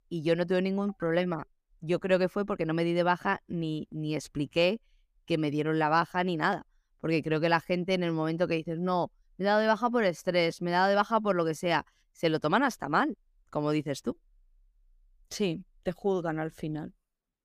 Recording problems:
none

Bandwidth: 15 kHz